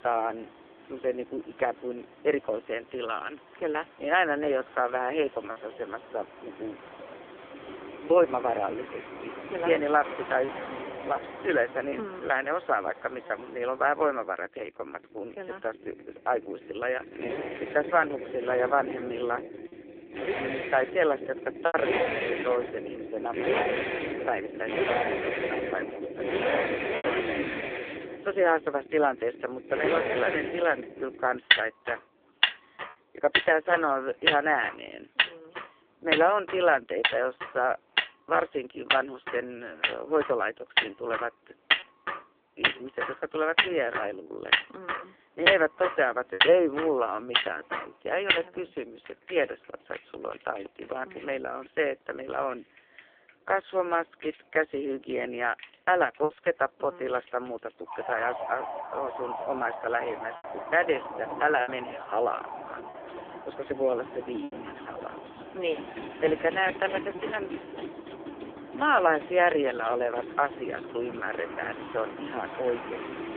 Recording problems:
phone-call audio; poor line
traffic noise; loud; throughout; 2 dB below the speech
choppy; occasionally; 1% of the speech affected

